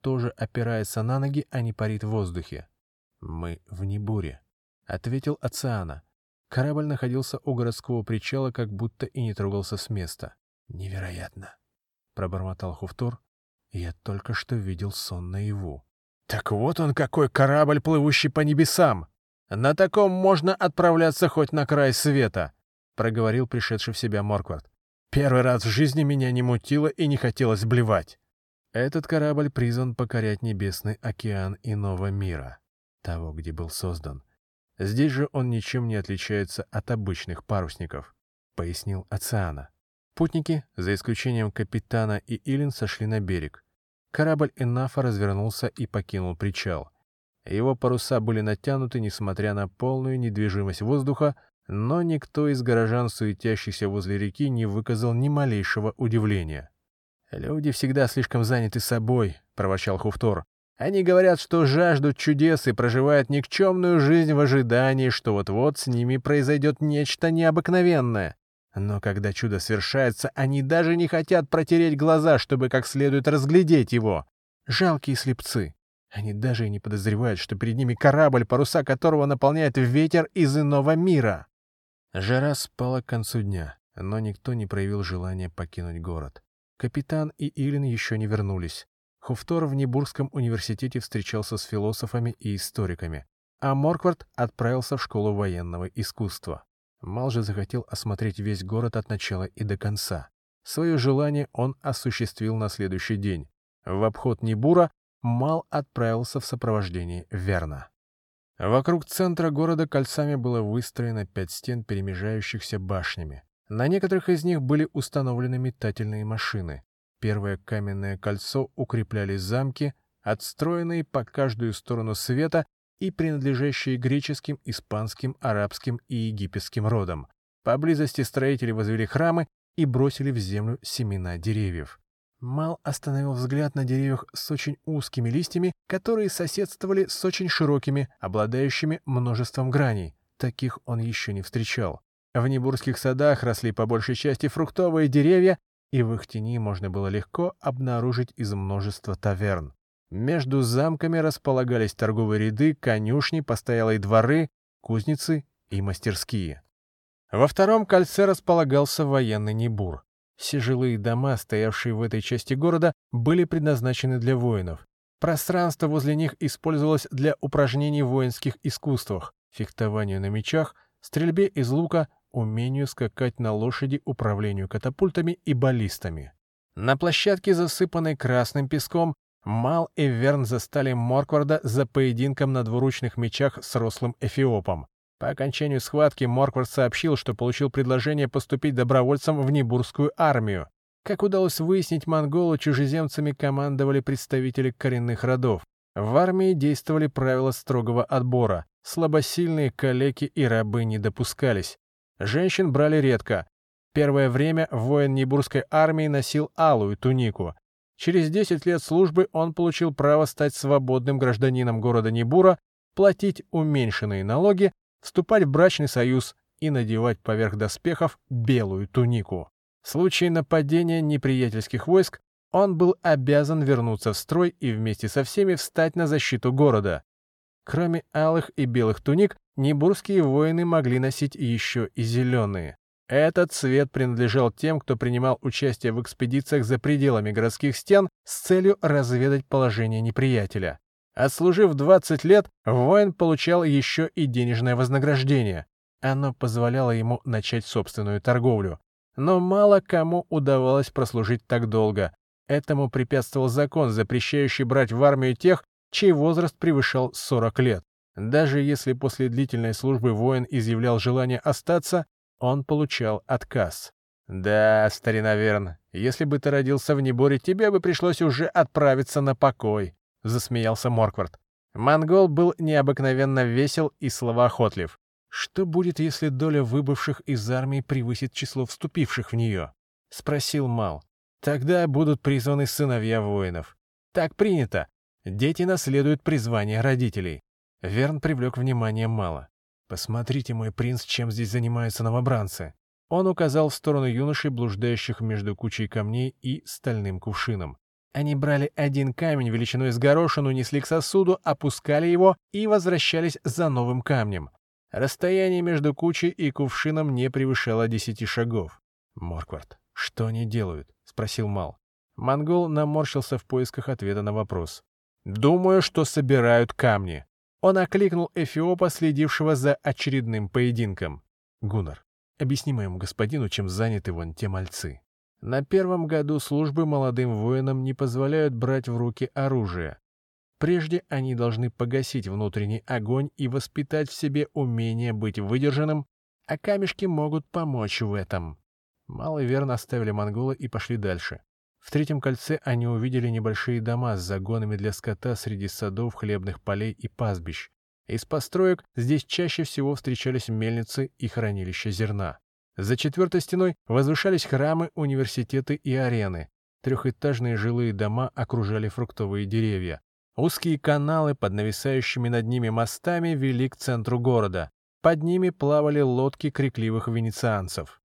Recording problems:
none

